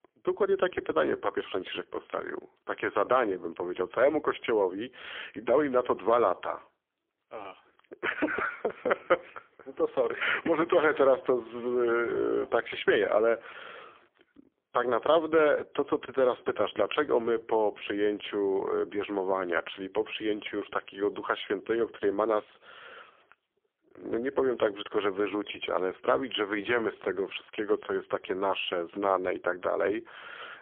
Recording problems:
phone-call audio; poor line; nothing above 3.5 kHz

